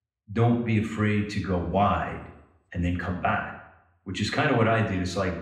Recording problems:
off-mic speech; far
room echo; noticeable; dies away in 0.7 s

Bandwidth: 15.5 kHz